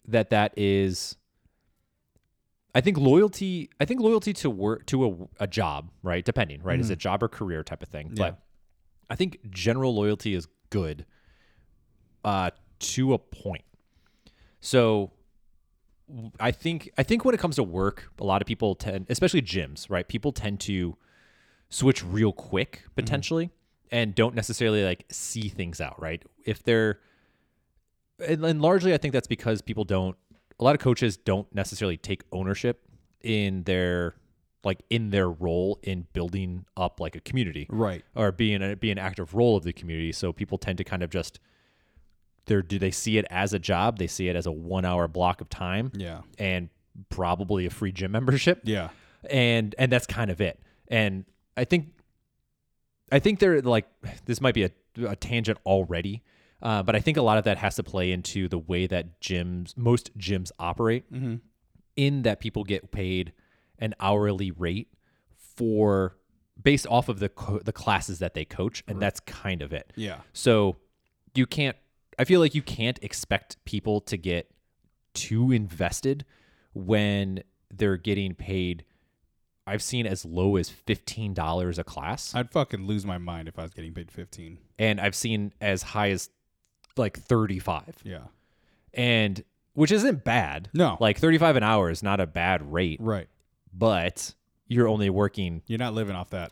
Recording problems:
none

